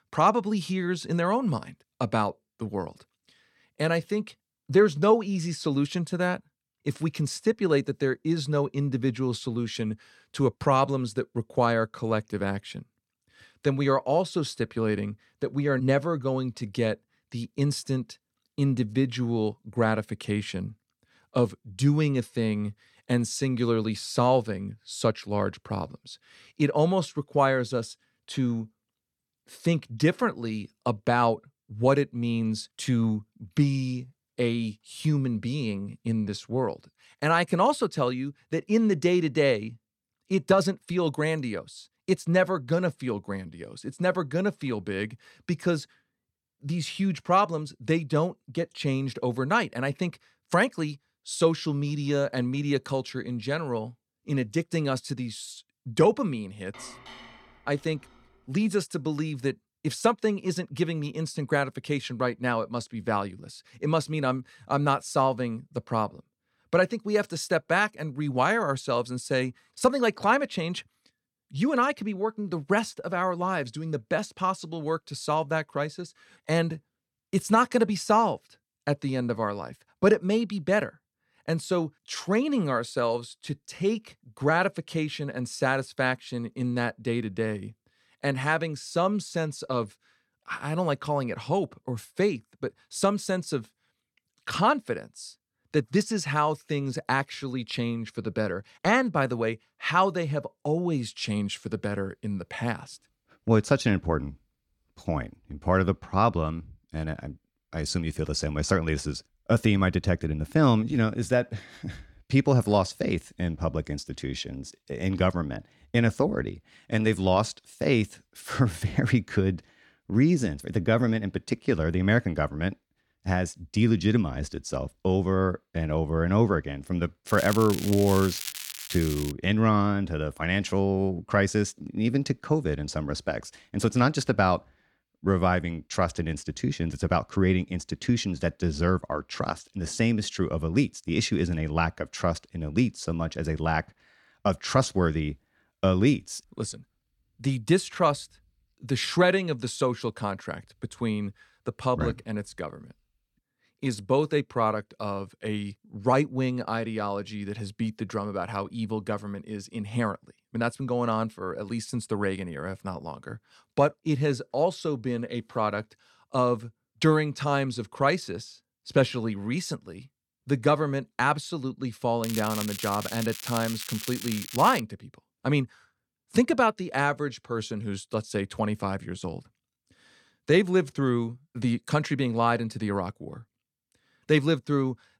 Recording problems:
crackling; loud; from 2:07 to 2:09 and from 2:52 to 2:55; 9 dB below the speech
clattering dishes; faint; from 57 to 58 s; peak 15 dB below the speech

